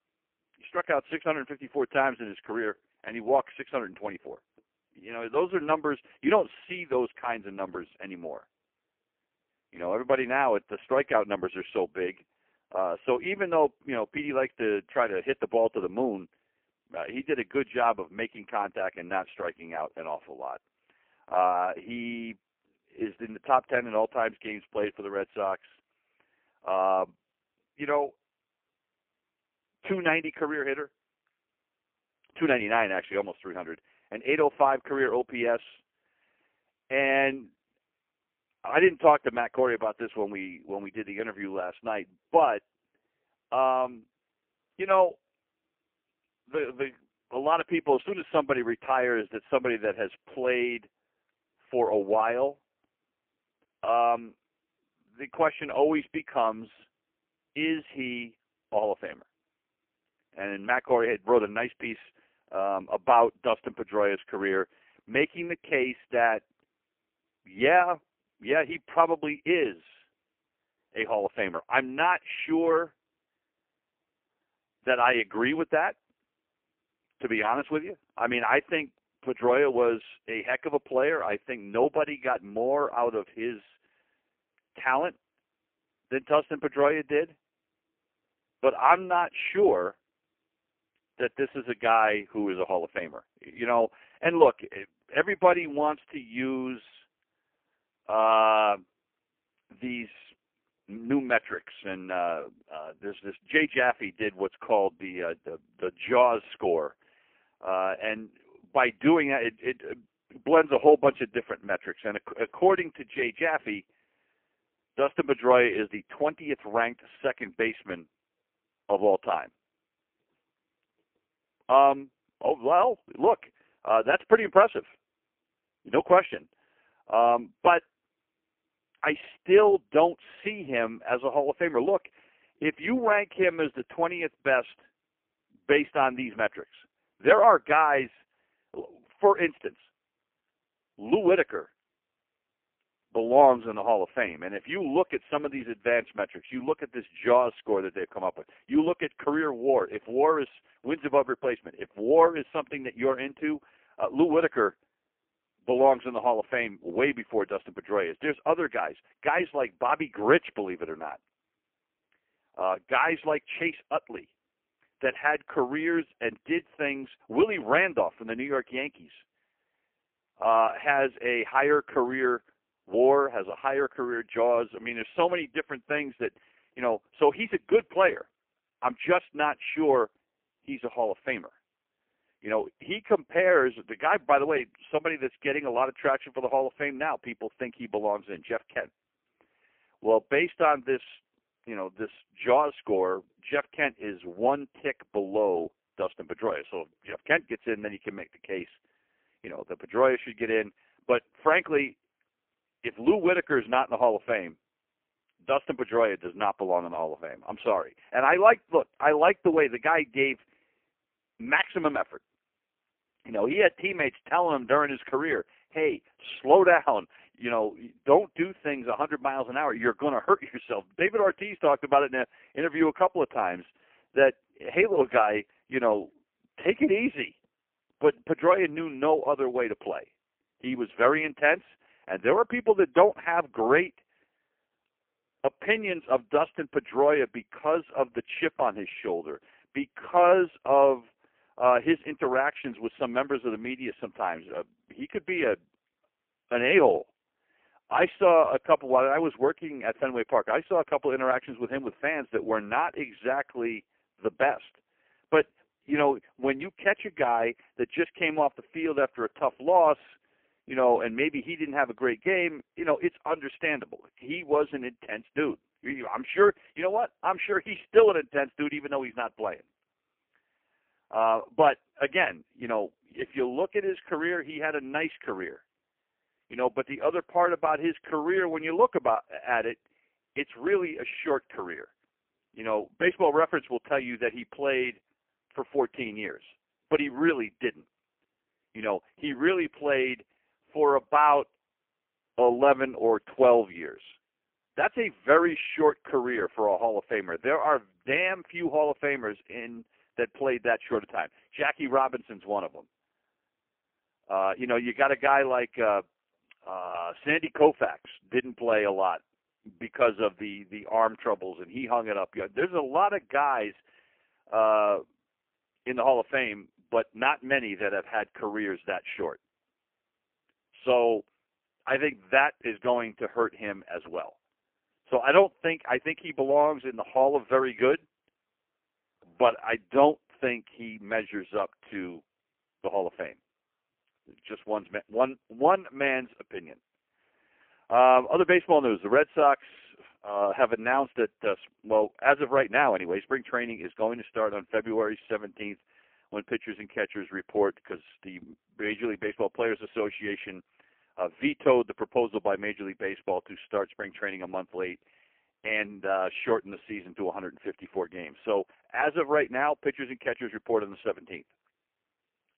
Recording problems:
phone-call audio; poor line; nothing above 3 kHz

